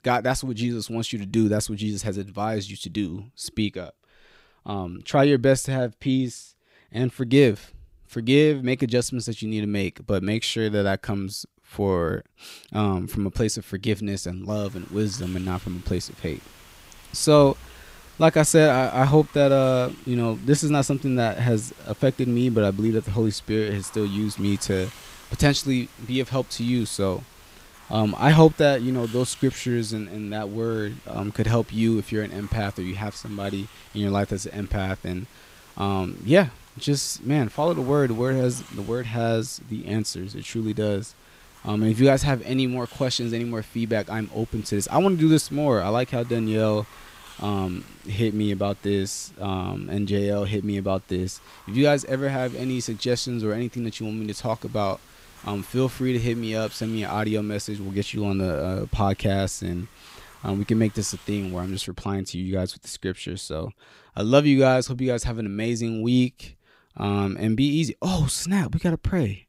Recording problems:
hiss; faint; from 14 s to 1:02; 25 dB below the speech

